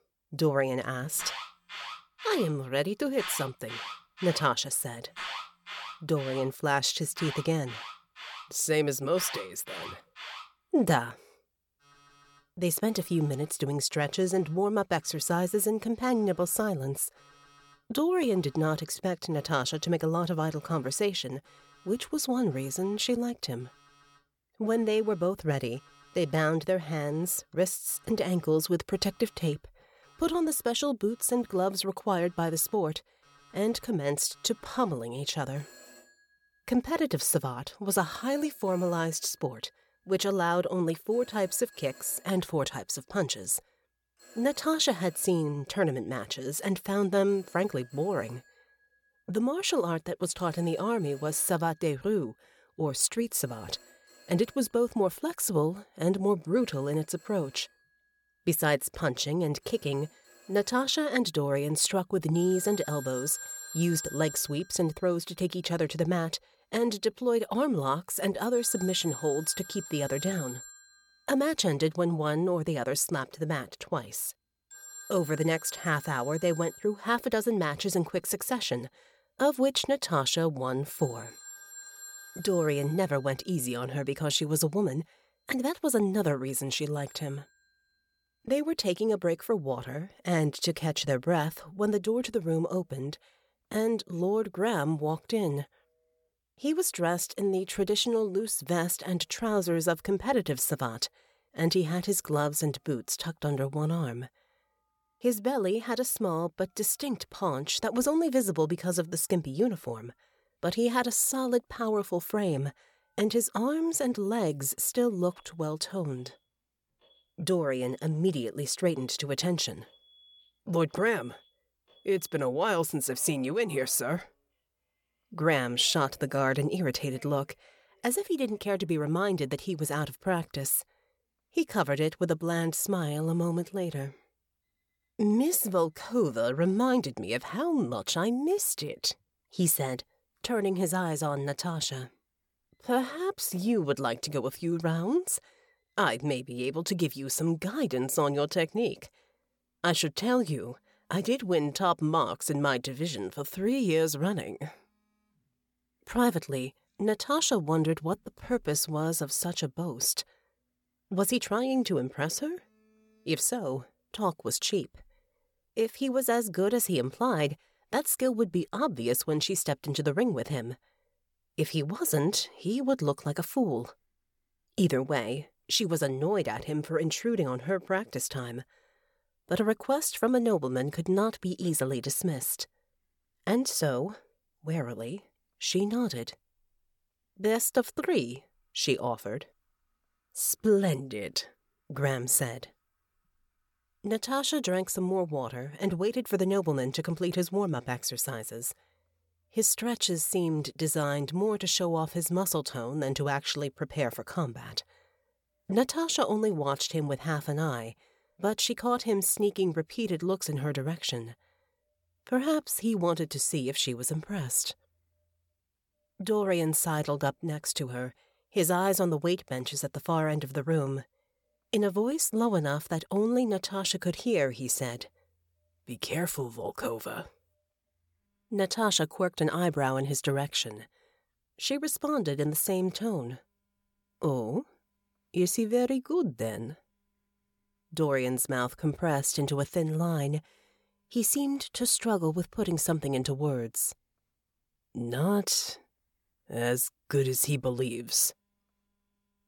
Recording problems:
alarms or sirens; noticeable; throughout; 15 dB below the speech

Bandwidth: 17.5 kHz